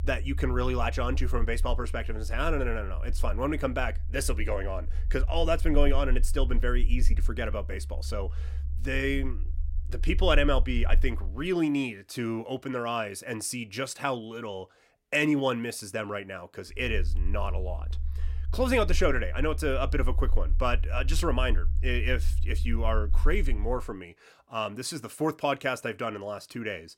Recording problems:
low rumble; faint; until 11 s and from 17 to 24 s; 20 dB below the speech

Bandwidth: 16.5 kHz